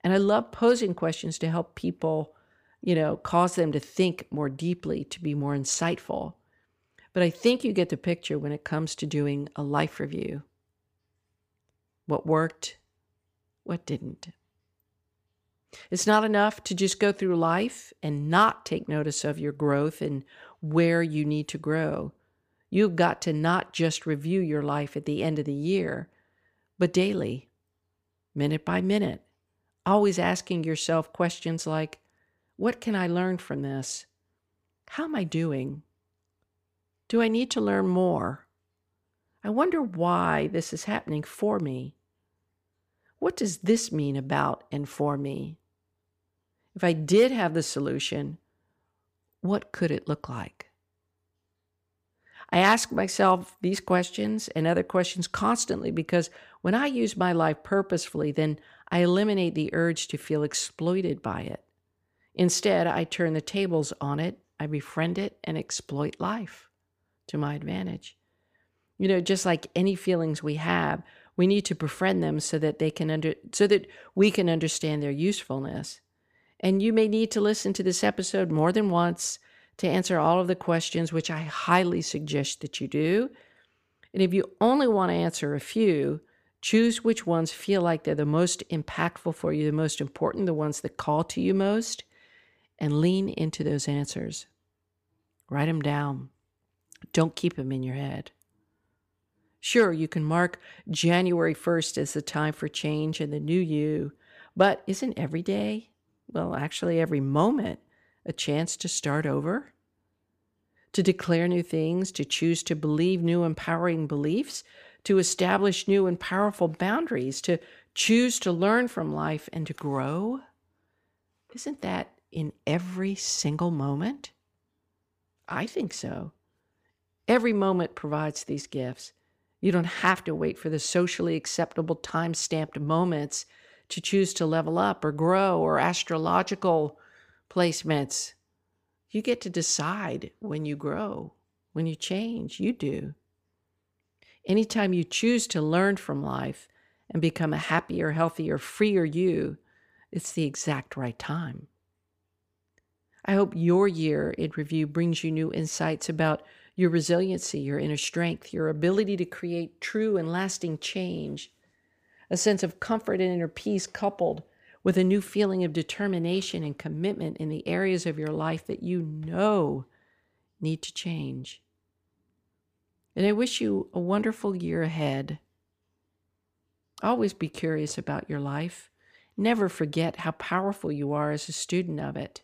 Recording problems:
none

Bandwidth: 15 kHz